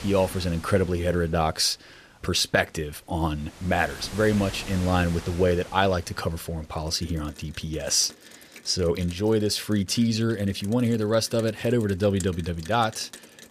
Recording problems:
rain or running water; noticeable; throughout; 20 dB below the speech

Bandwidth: 14.5 kHz